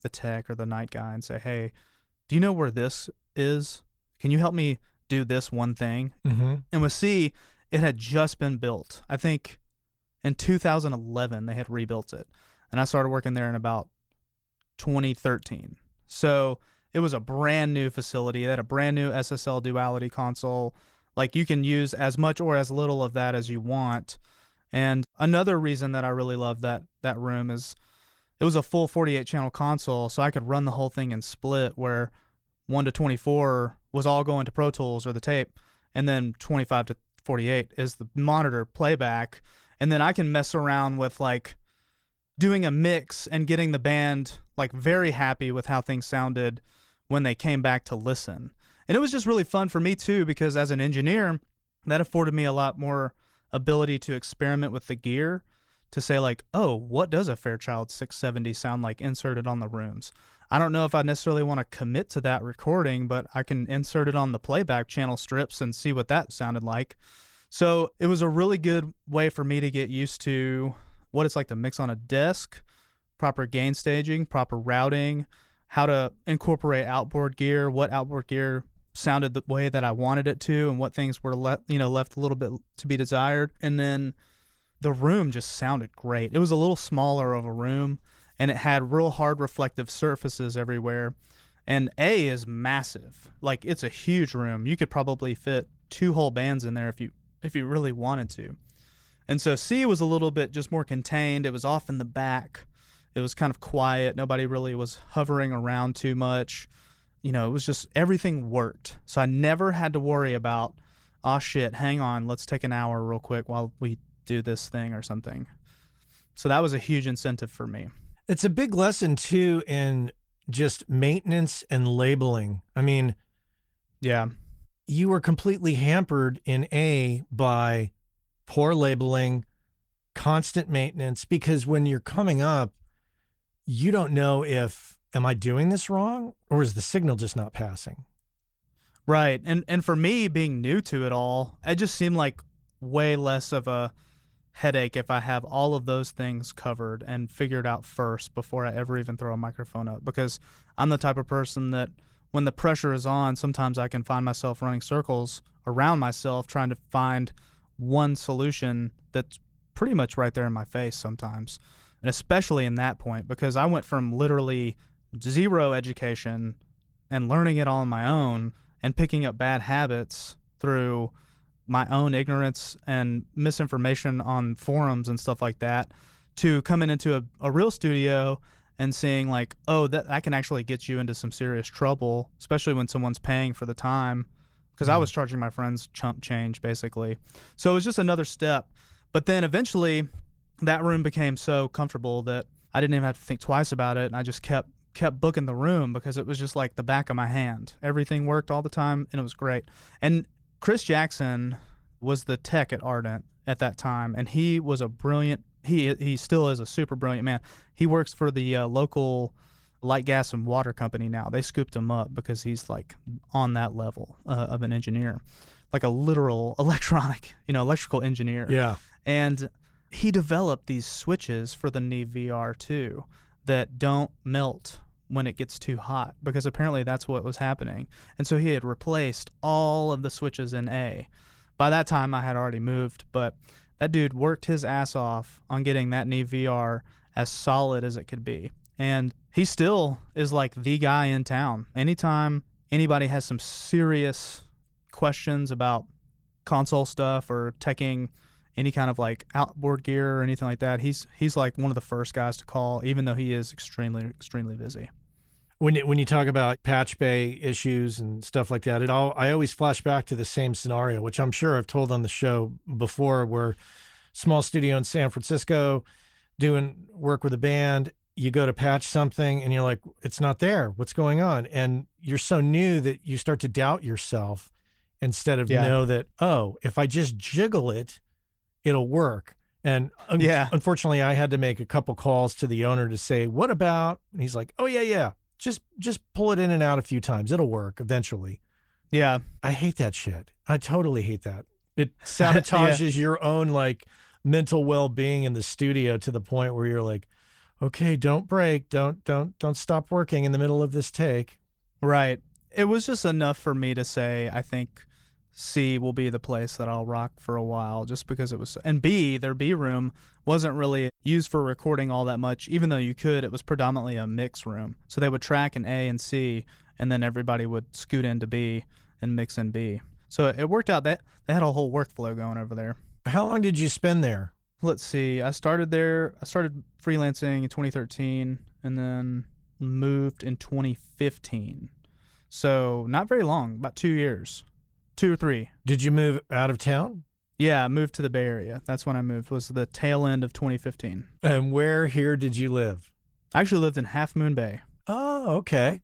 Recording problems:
garbled, watery; slightly; nothing above 19 kHz

